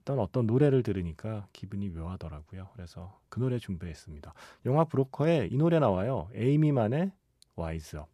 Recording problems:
none

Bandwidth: 14 kHz